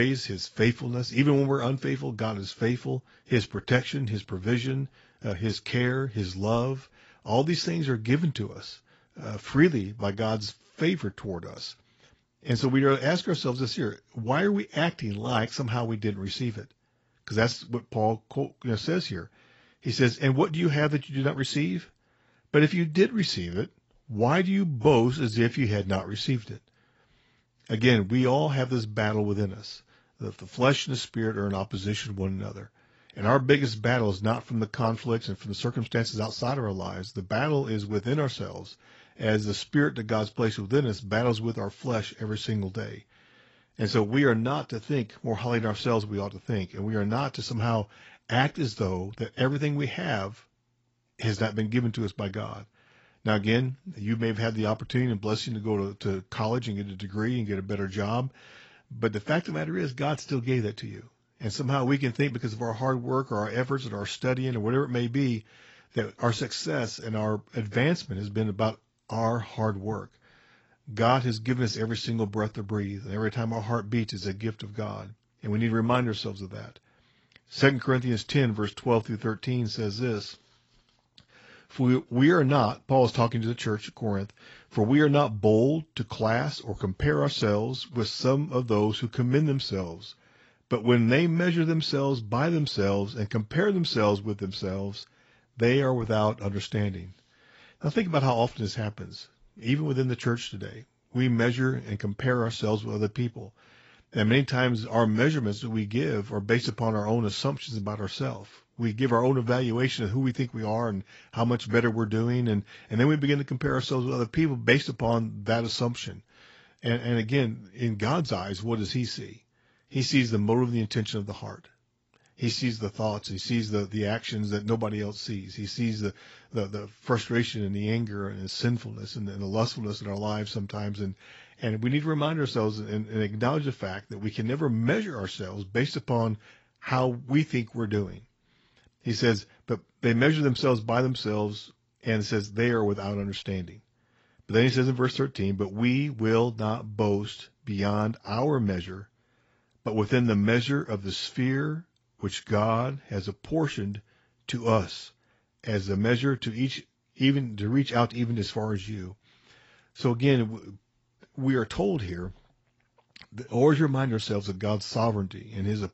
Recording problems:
garbled, watery; badly; nothing above 7.5 kHz
abrupt cut into speech; at the start

